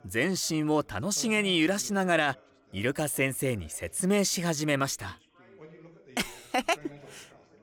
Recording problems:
background chatter; faint; throughout; 3 voices, 25 dB below the speech

